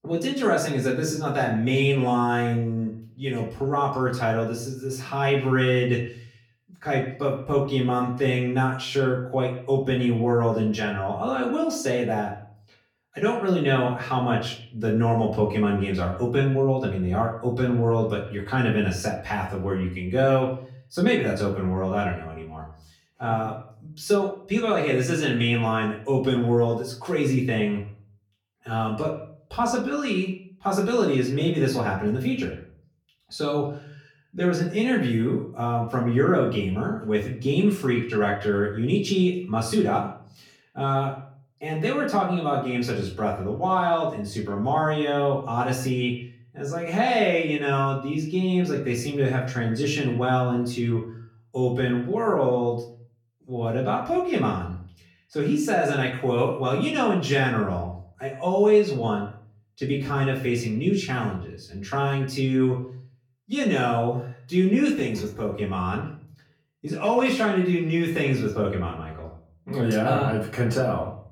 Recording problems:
off-mic speech; far
echo of what is said; faint; throughout; 110 ms later, 20 dB below the speech
room echo; slight; dies away in 0.5 s

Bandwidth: 17 kHz